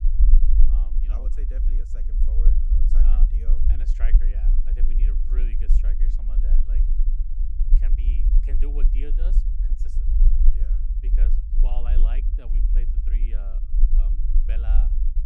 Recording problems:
low rumble; loud; throughout; 1 dB below the speech

